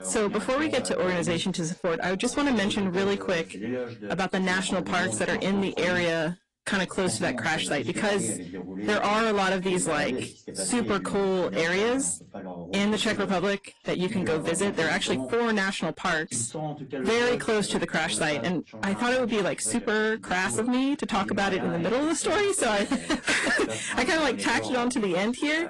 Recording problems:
distortion; heavy; 6 dB below the speech
garbled, watery; slightly; nothing above 10 kHz
voice in the background; noticeable; throughout; 10 dB below the speech

